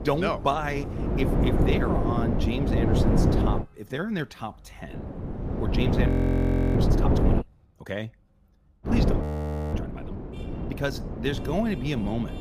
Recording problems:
wind noise on the microphone; heavy; until 3.5 s, from 5 to 7.5 s and from 9 s on; as loud as the speech
traffic noise; faint; throughout; 20 dB below the speech
audio freezing; at 6 s for 0.5 s and at 9 s for 0.5 s

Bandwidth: 15 kHz